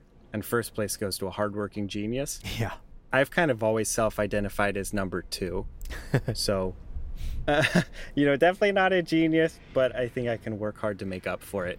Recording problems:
wind in the background; faint; throughout; 20 dB below the speech

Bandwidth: 16 kHz